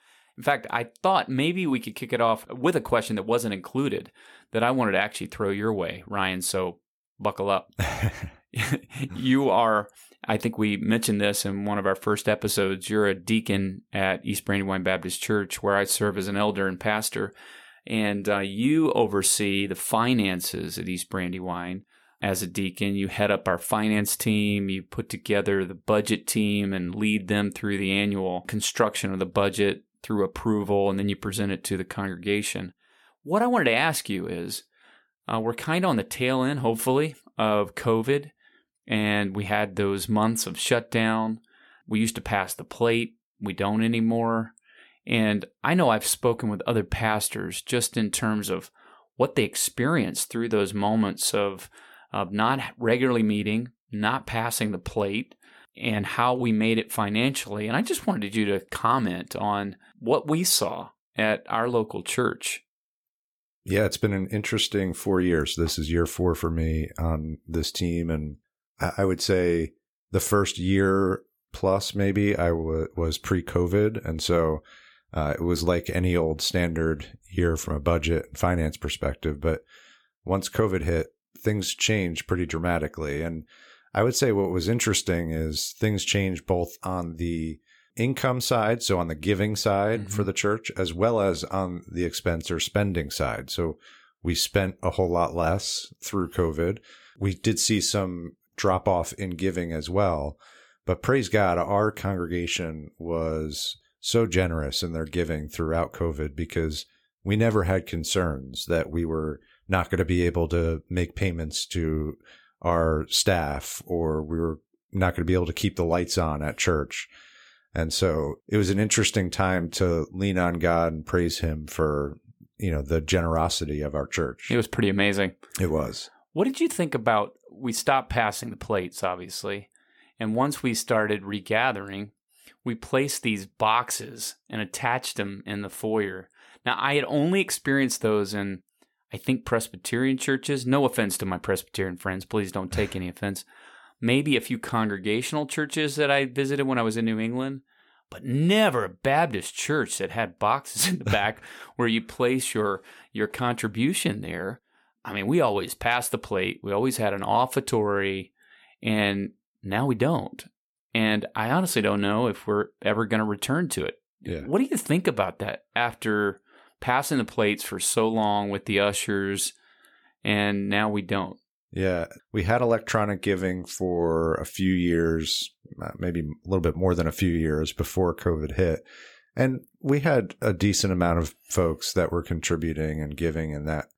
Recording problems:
none

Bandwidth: 17.5 kHz